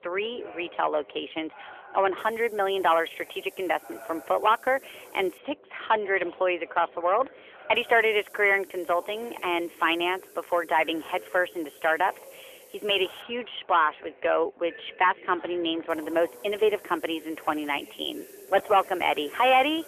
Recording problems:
phone-call audio; nothing above 3.5 kHz
distortion; slight; 2% of the sound clipped
background chatter; faint; throughout; 4 voices, 20 dB below the speech
hiss; faint; from 2 to 5.5 s, from 8 to 13 s and from 16 s on; 25 dB below the speech

